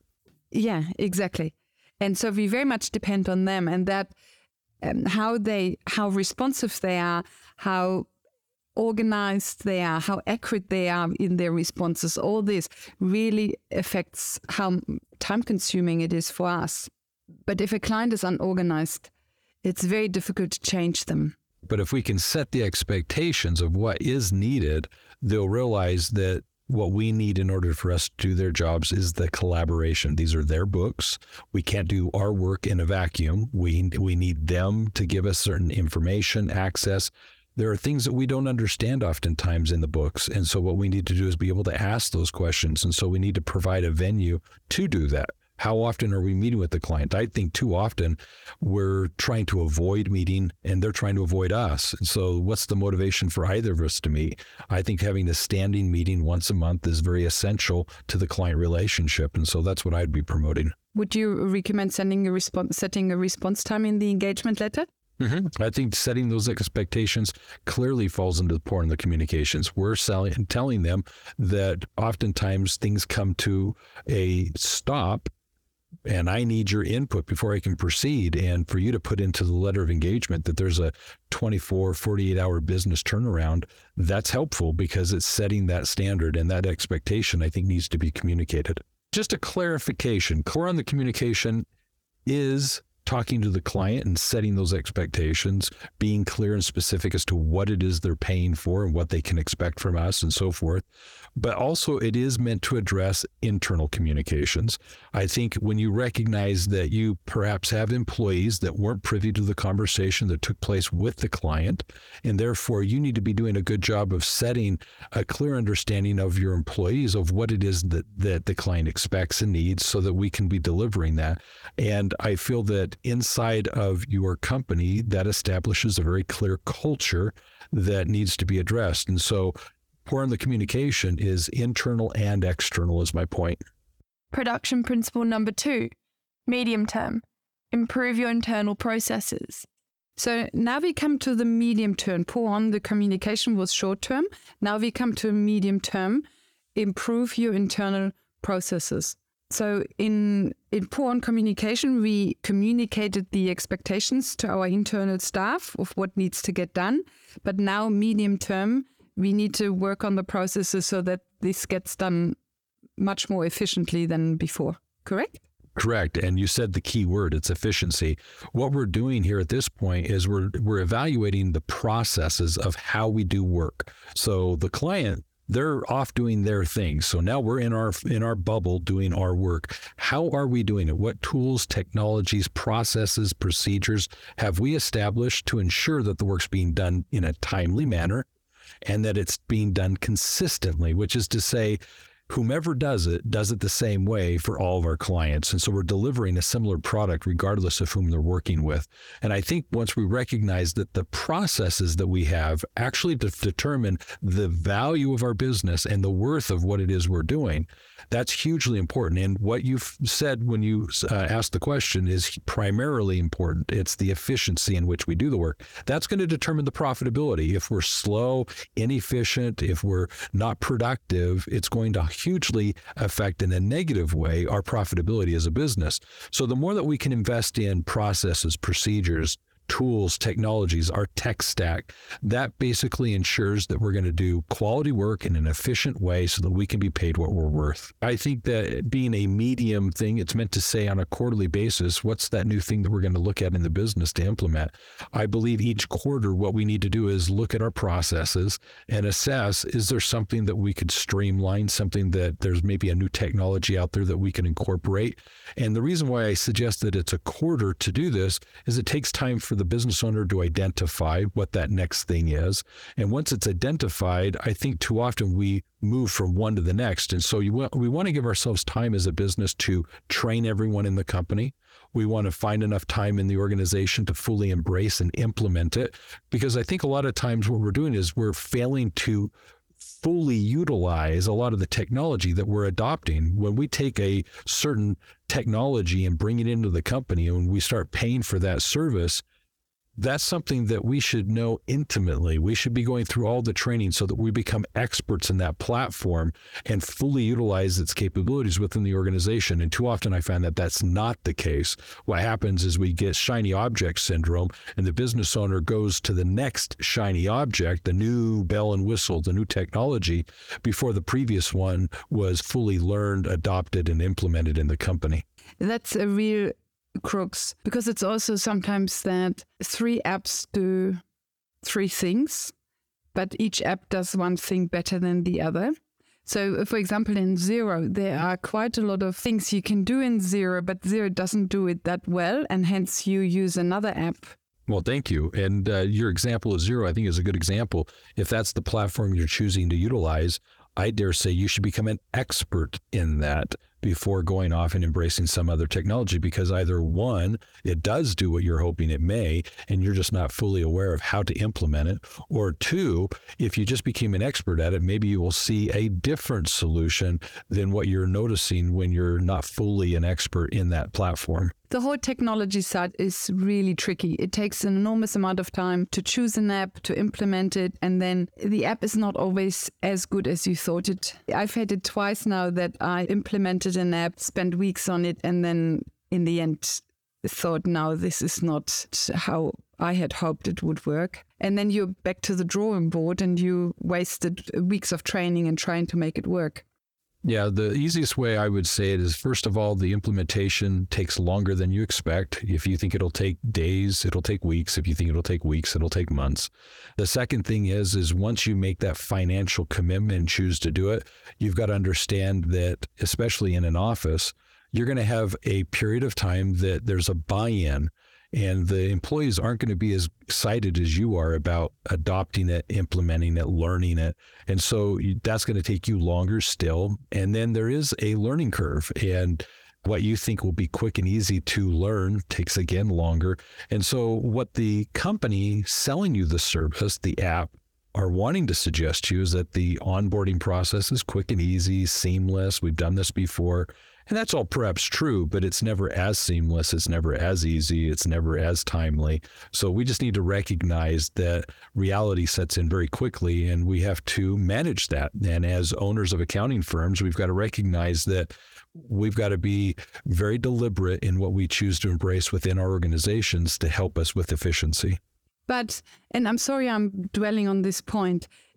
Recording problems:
squashed, flat; somewhat

